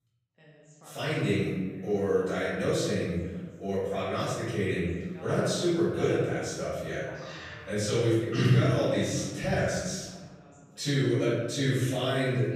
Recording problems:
room echo; strong; dies away in 1.3 s
off-mic speech; far
voice in the background; faint; throughout; 25 dB below the speech

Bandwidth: 15 kHz